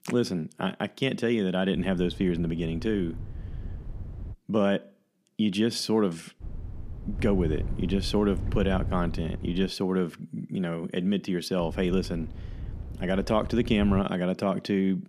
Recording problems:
wind noise on the microphone; occasional gusts; from 2 to 4.5 s, from 6.5 to 9.5 s and from 12 to 14 s; 20 dB below the speech

